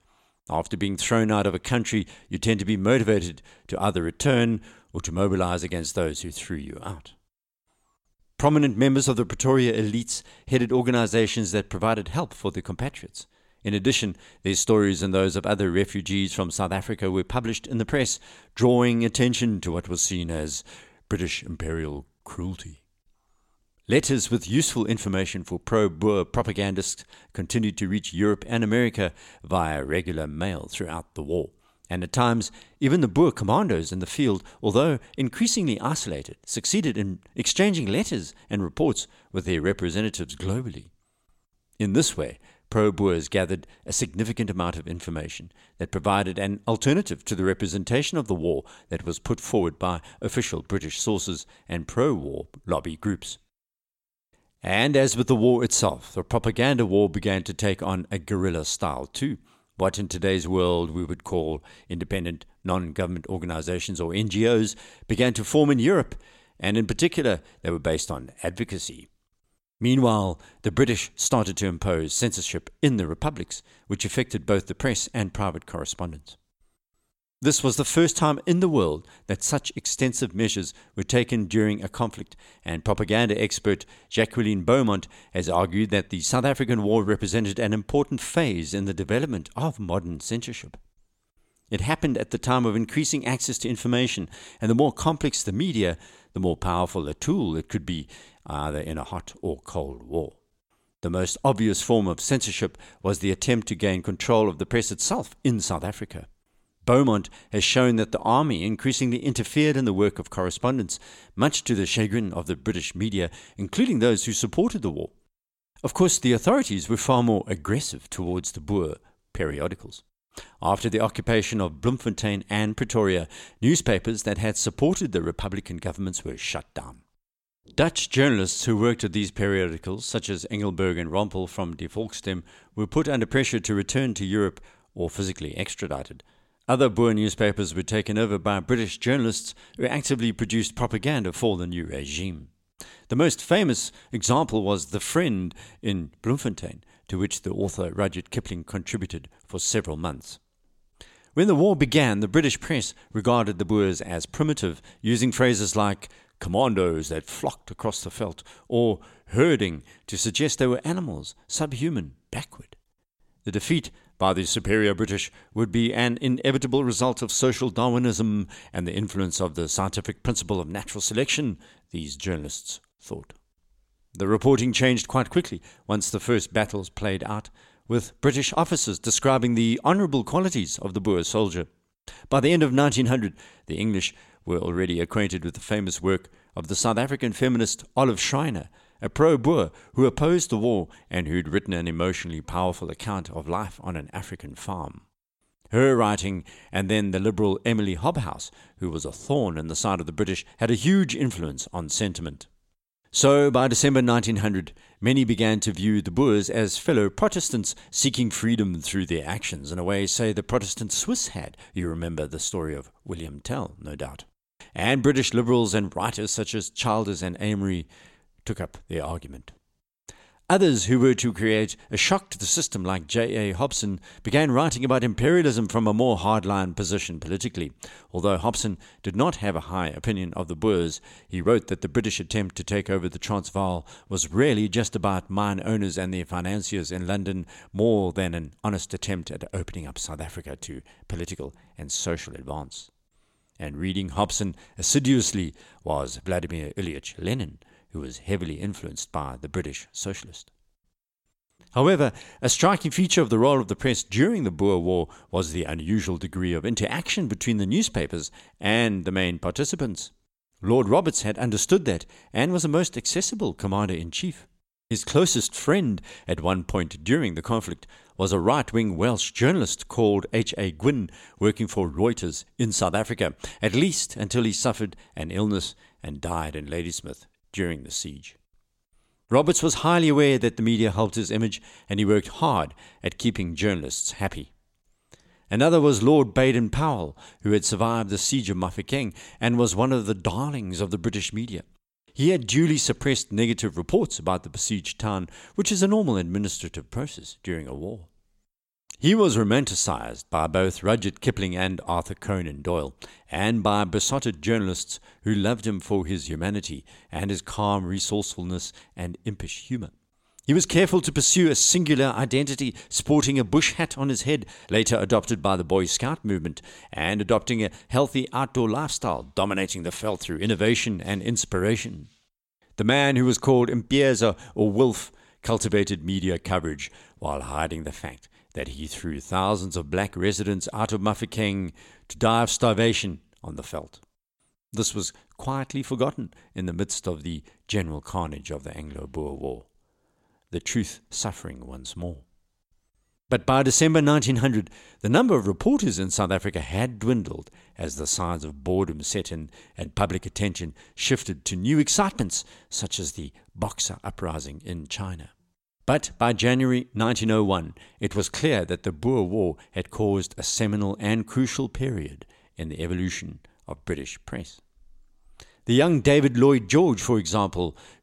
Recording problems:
none

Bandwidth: 16.5 kHz